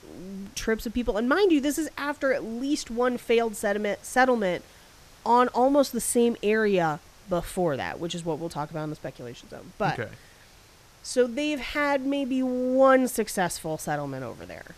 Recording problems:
hiss; faint; throughout; 25 dB below the speech

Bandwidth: 14.5 kHz